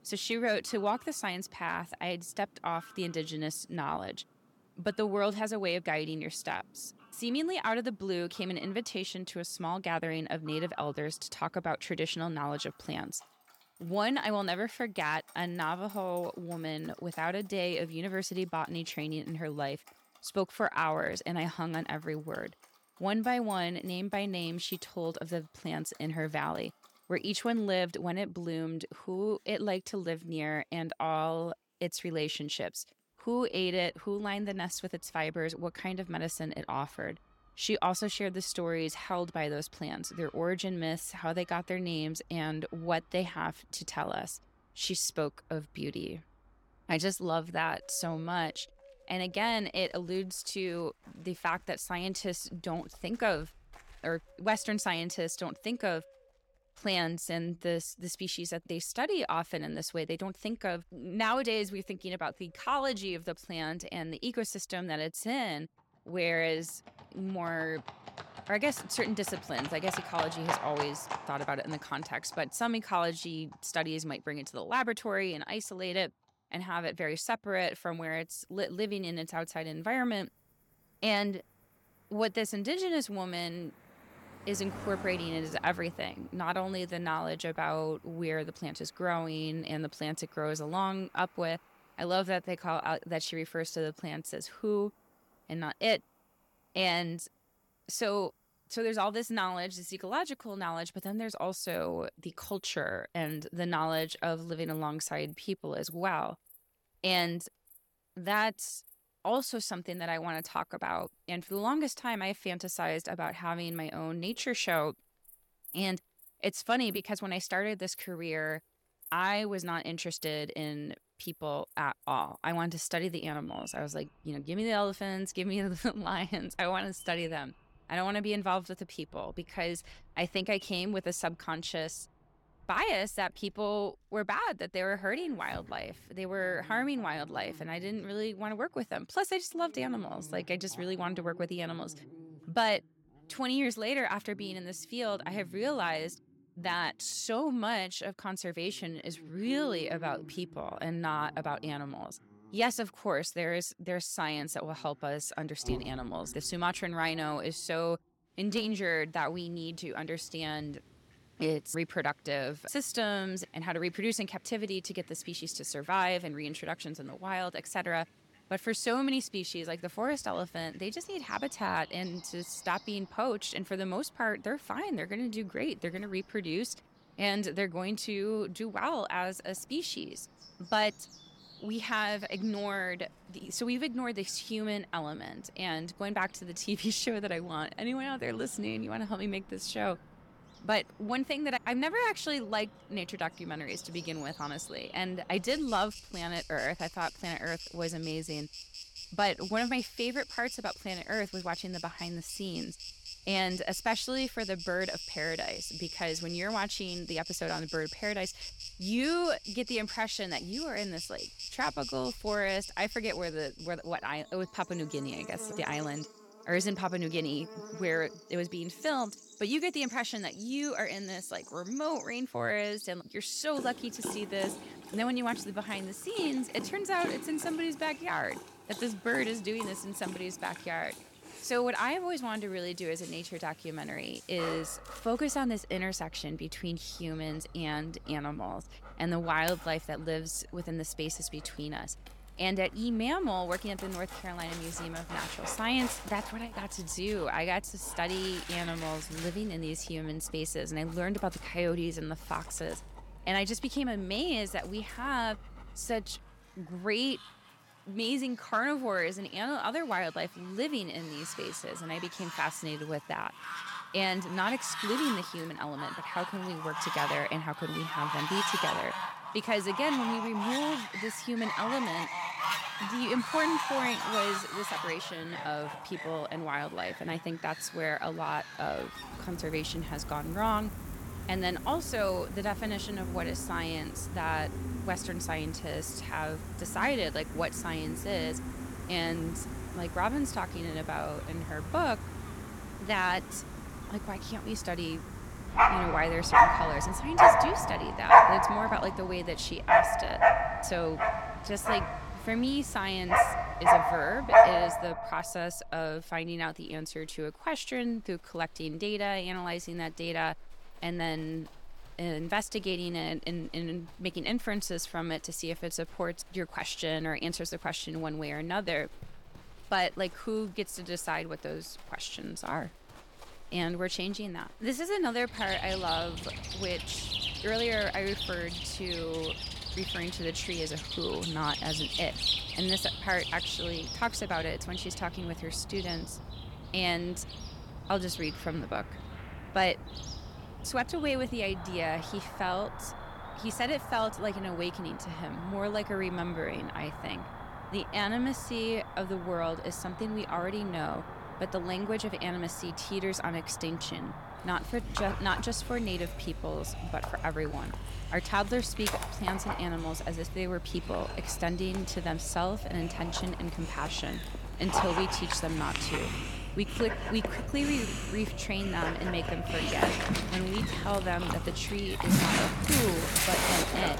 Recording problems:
animal sounds; very loud; throughout; as loud as the speech

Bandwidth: 17 kHz